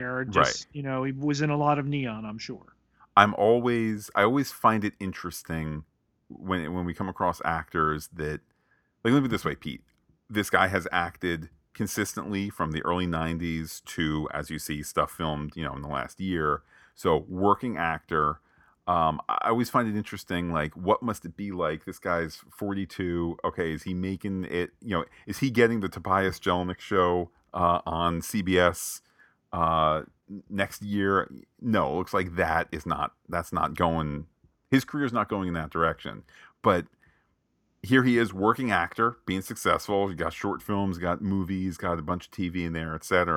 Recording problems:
abrupt cut into speech; at the start and the end

